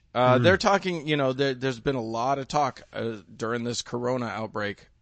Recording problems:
high frequencies cut off; noticeable; nothing above 7.5 kHz
garbled, watery; slightly

